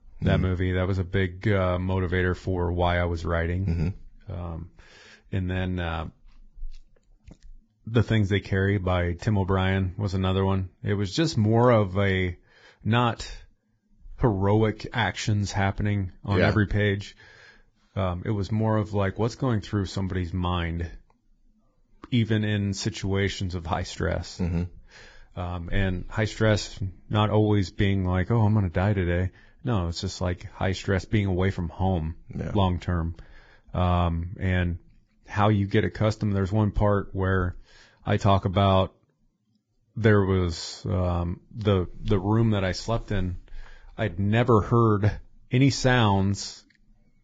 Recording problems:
garbled, watery; badly; nothing above 7.5 kHz

